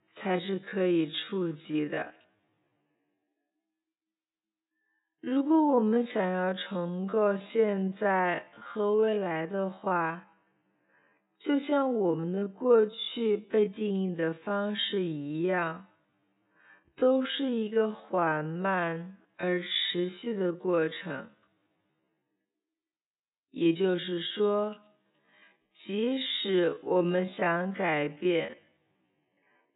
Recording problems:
high frequencies cut off; severe; nothing above 4 kHz
wrong speed, natural pitch; too slow; 0.5 times normal speed

